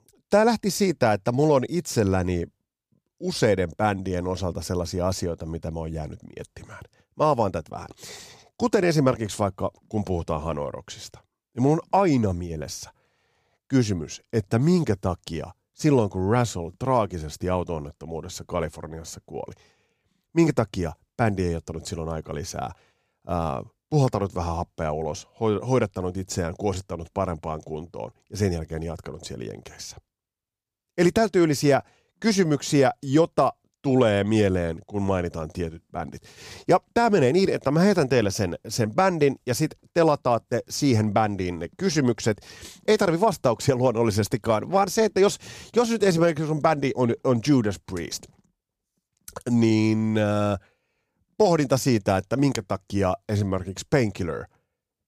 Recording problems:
none

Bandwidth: 15 kHz